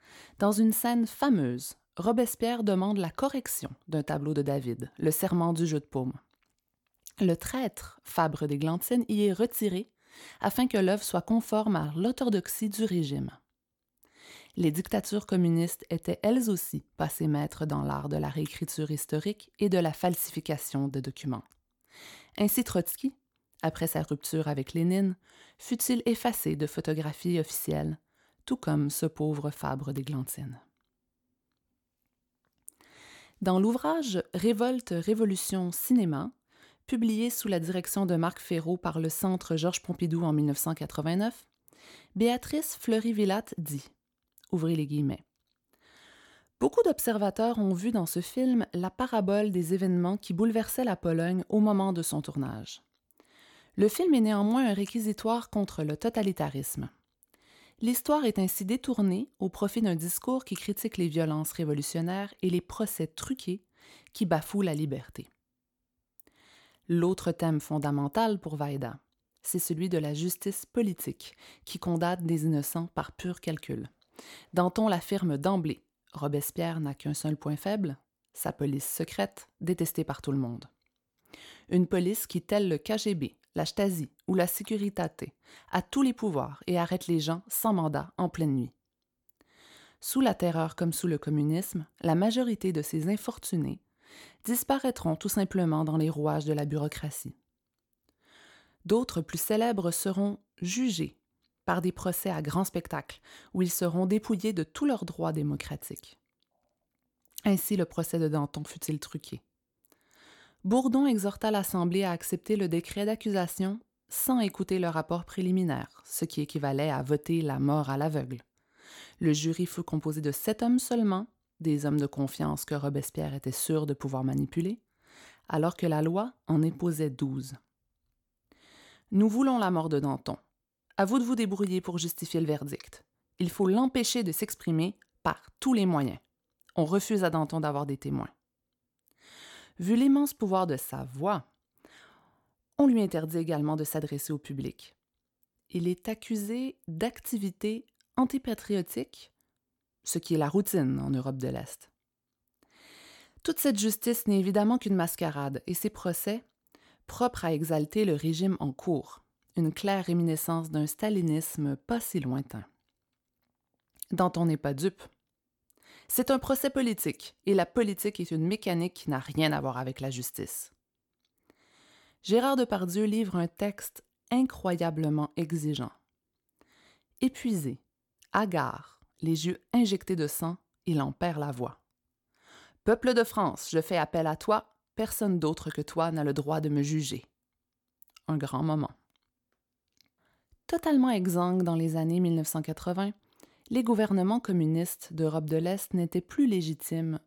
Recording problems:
none

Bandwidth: 18 kHz